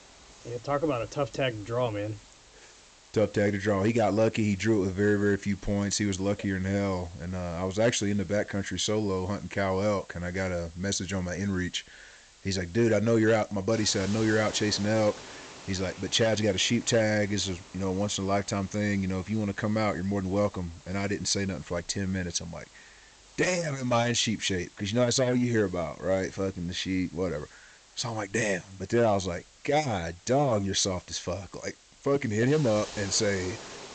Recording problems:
high frequencies cut off; noticeable; nothing above 8 kHz
hiss; faint; throughout; 20 dB below the speech

